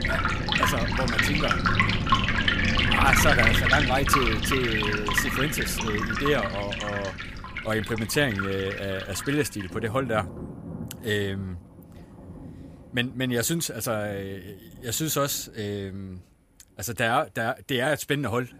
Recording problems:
rain or running water; very loud; throughout; 3 dB above the speech

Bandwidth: 15 kHz